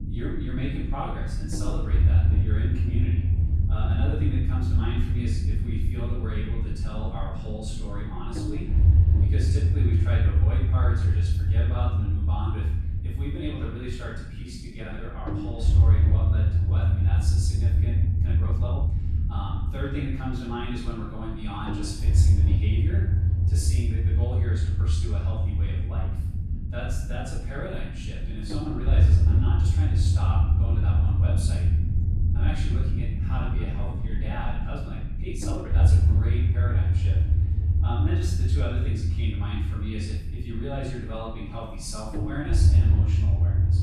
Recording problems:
off-mic speech; far
room echo; noticeable; dies away in 0.7 s
low rumble; loud; throughout; 2 dB below the speech
uneven, jittery; strongly; from 14 to 36 s

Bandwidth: 13.5 kHz